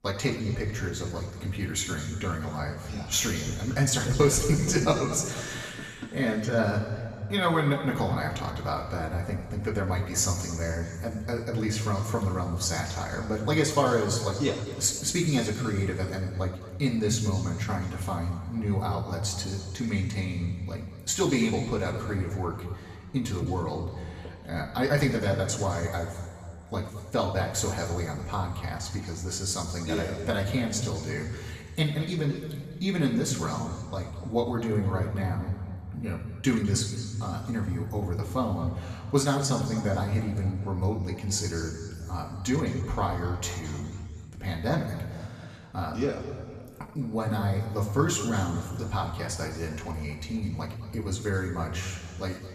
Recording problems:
room echo; noticeable; dies away in 2 s
off-mic speech; somewhat distant

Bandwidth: 14.5 kHz